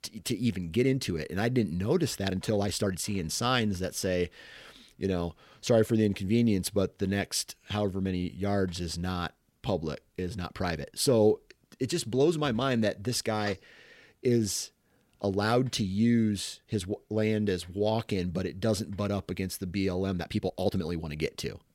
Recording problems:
uneven, jittery; strongly; from 2 to 21 s

